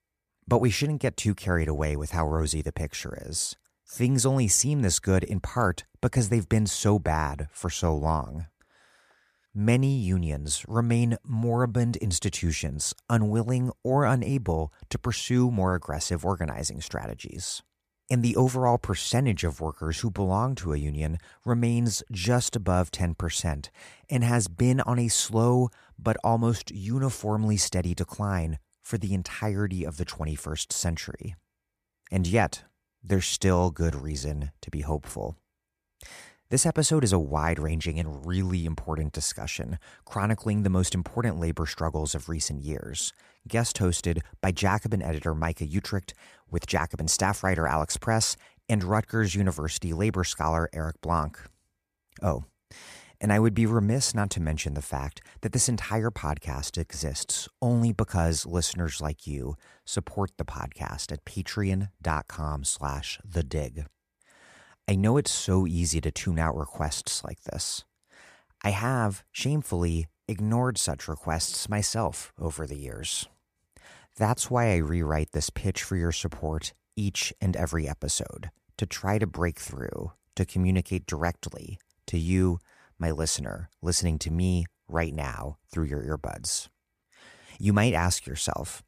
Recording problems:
none

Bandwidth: 14.5 kHz